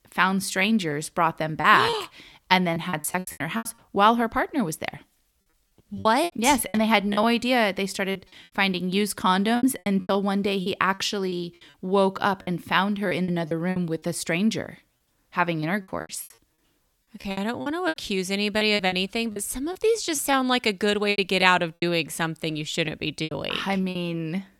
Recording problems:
choppy; very; 11% of the speech affected

